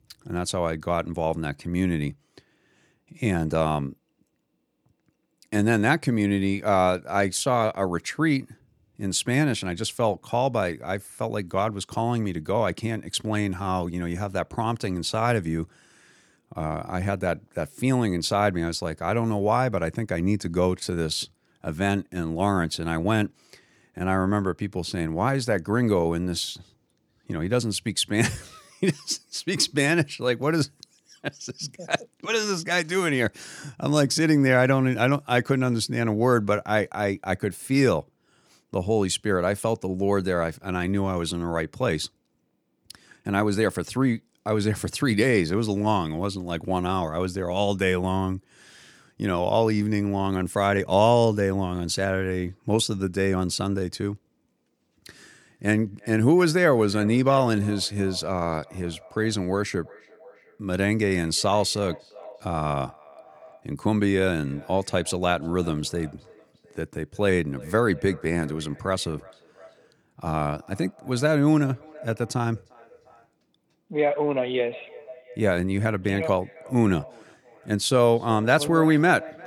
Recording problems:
echo of what is said; faint; from 55 s on; 350 ms later, 20 dB below the speech

